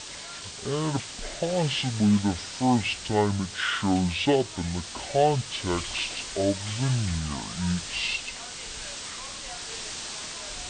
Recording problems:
wrong speed and pitch; too slow and too low; 0.6 times normal speed
high frequencies cut off; slight; nothing above 6 kHz
hiss; loud; throughout; 8 dB below the speech

